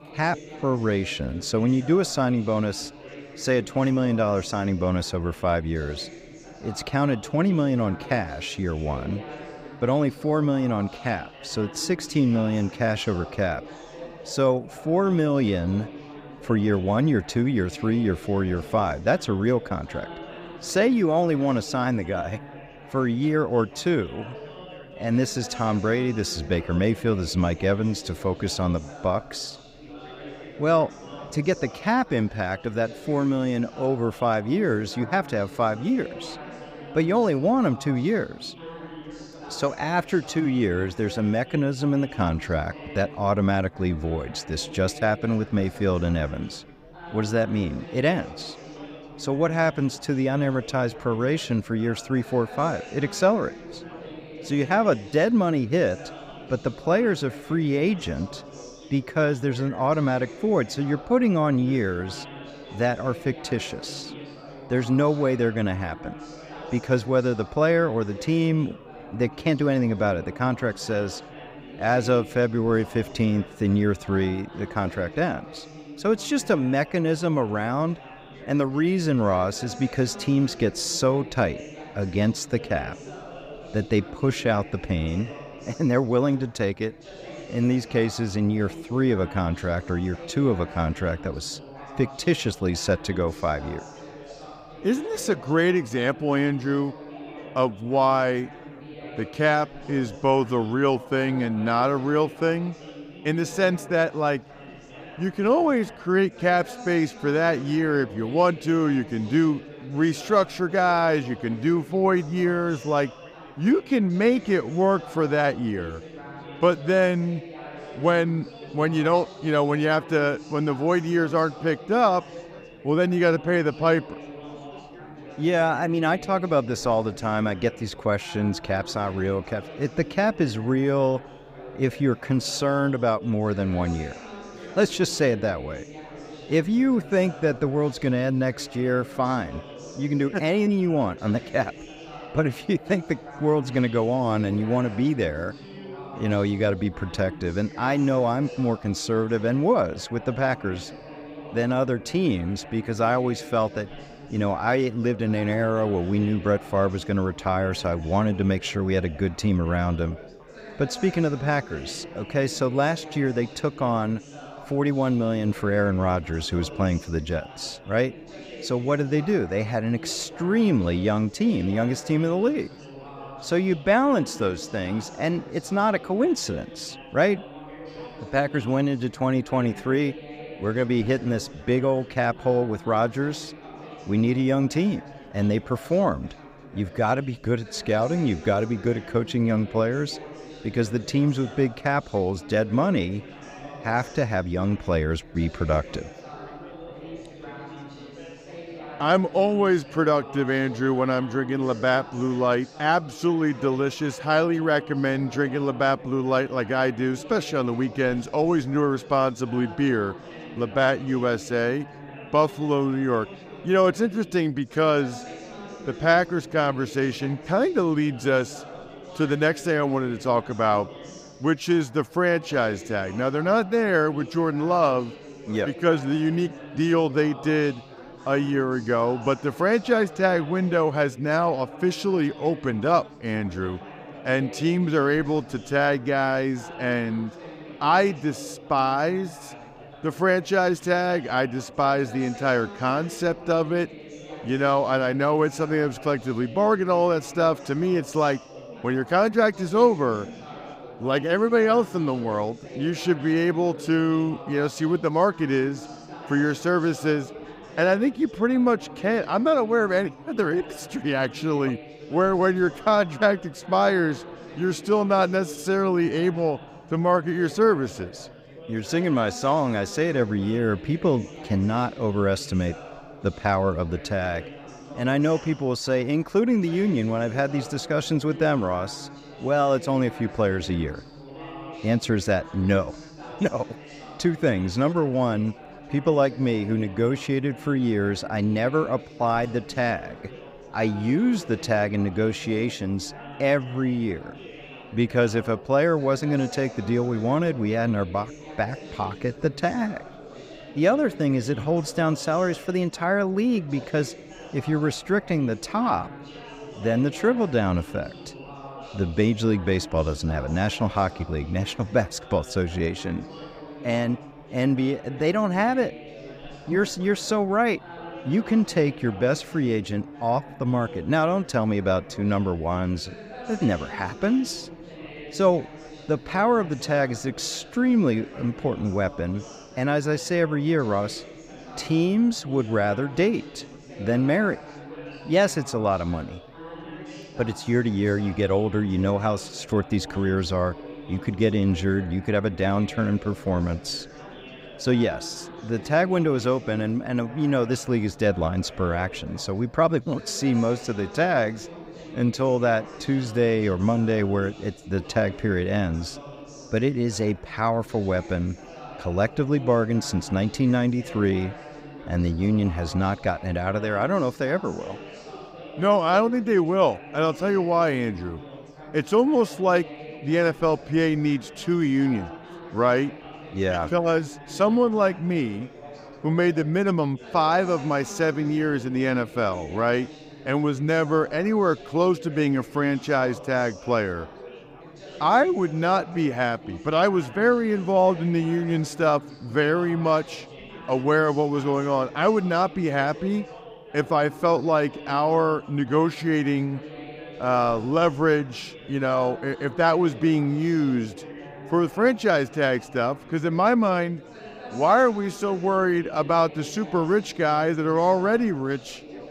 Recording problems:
background chatter; noticeable; throughout; 4 voices, 15 dB below the speech

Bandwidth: 15.5 kHz